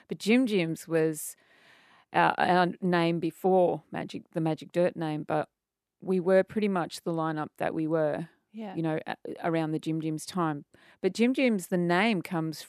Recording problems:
none

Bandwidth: 14 kHz